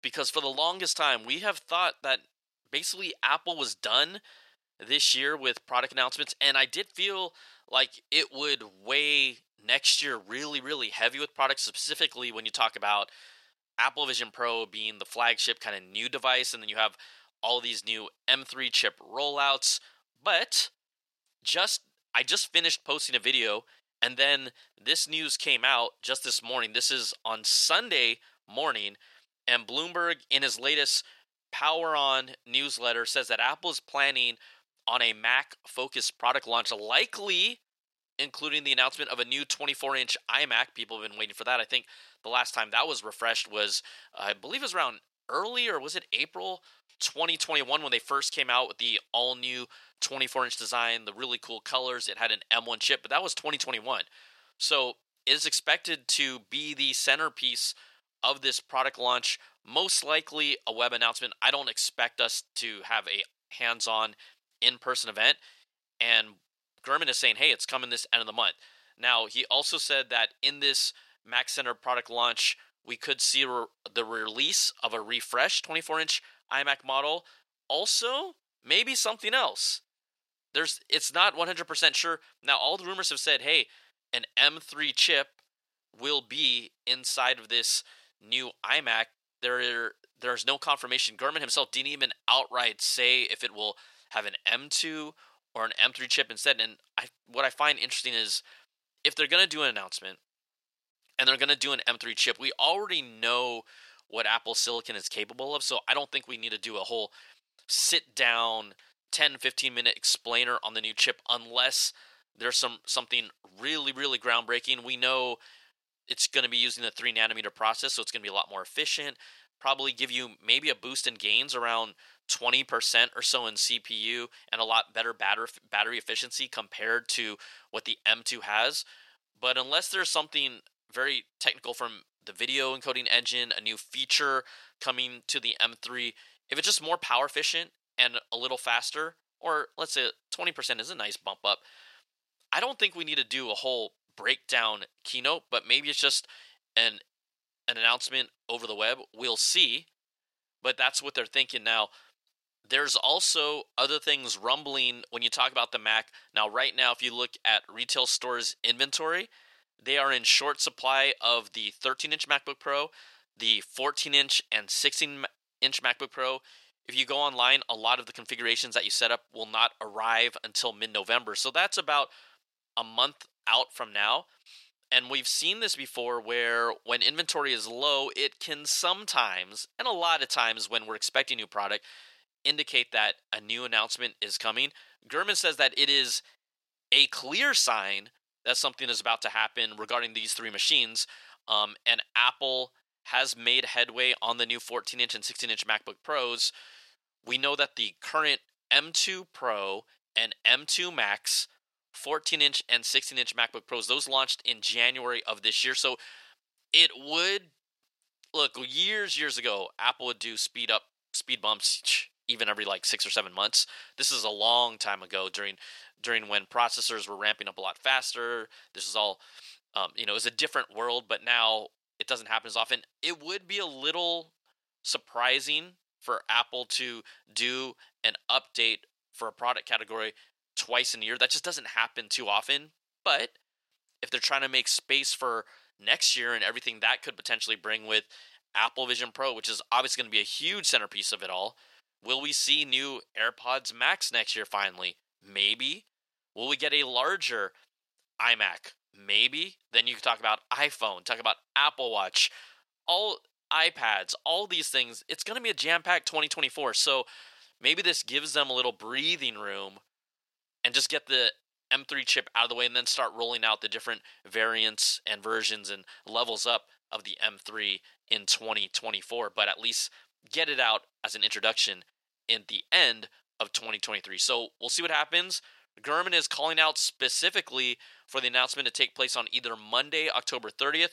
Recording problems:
thin; very; fading below 700 Hz

